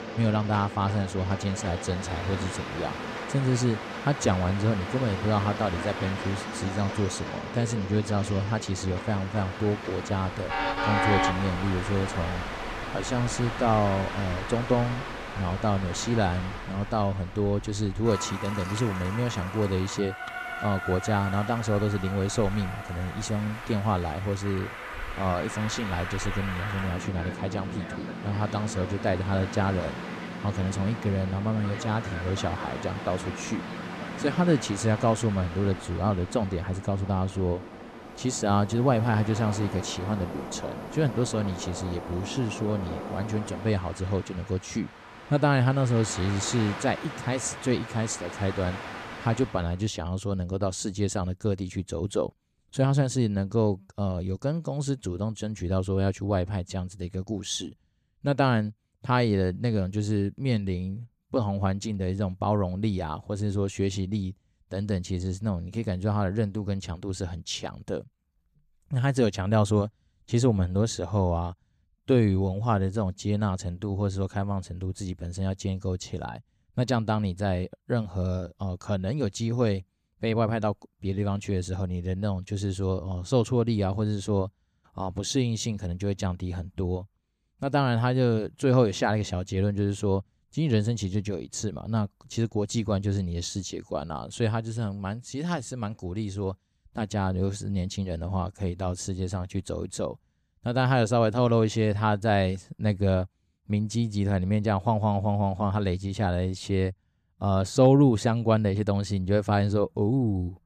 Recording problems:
train or aircraft noise; loud; until 50 s; 8 dB below the speech

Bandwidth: 14.5 kHz